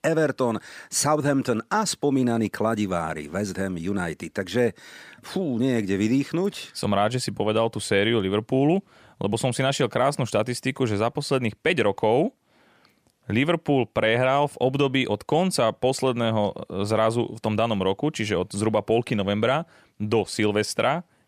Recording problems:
none

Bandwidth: 15 kHz